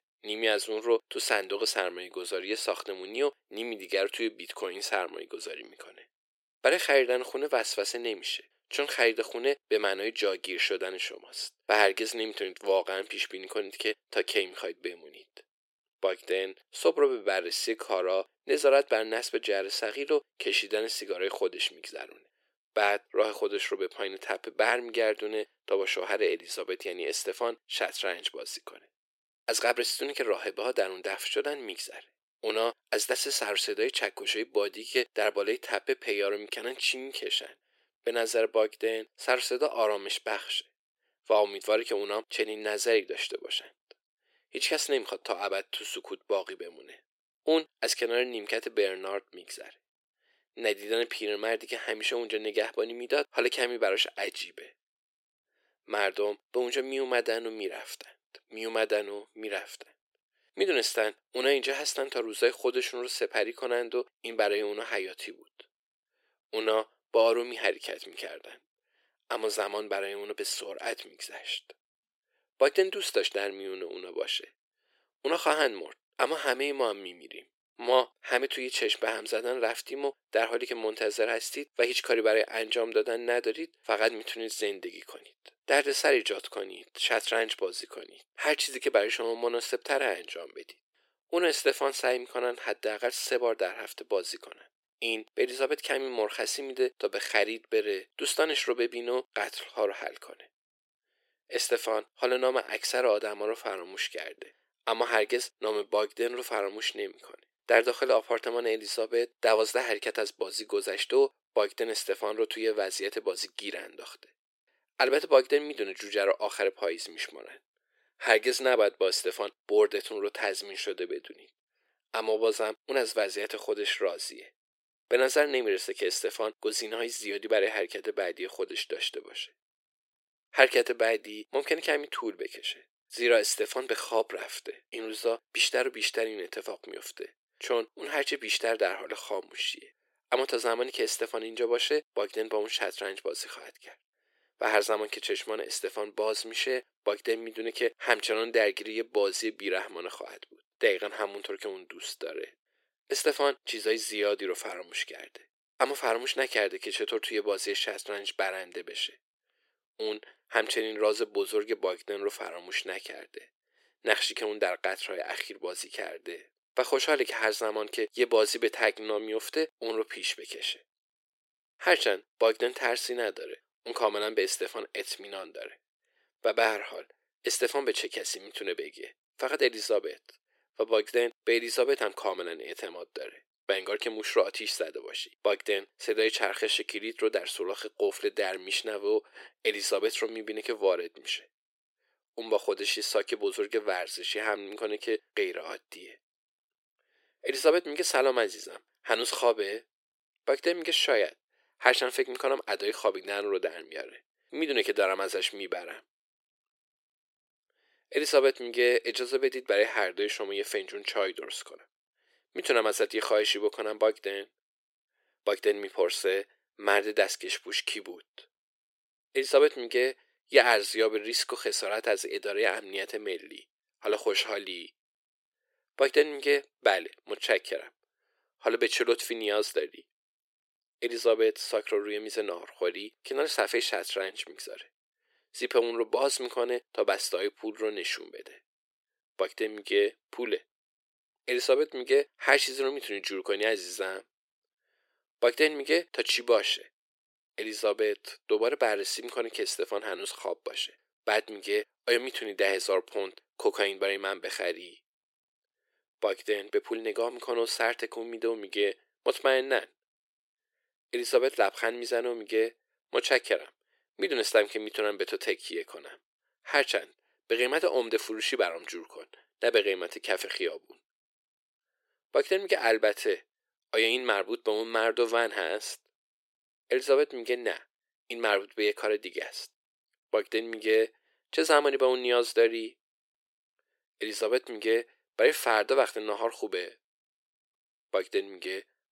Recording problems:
thin; very; fading below 350 Hz

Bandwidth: 16 kHz